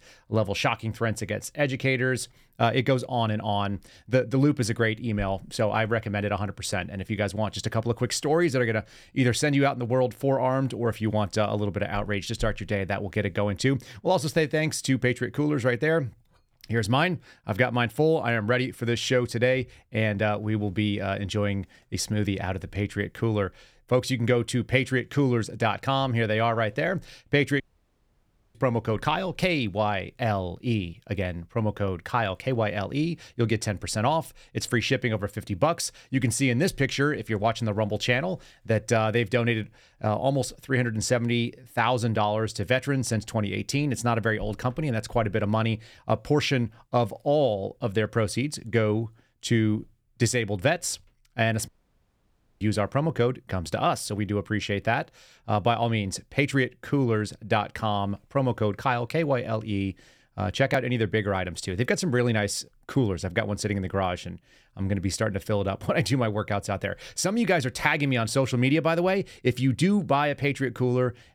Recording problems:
audio cutting out; at 28 s for 1 s and at 52 s for 1 s

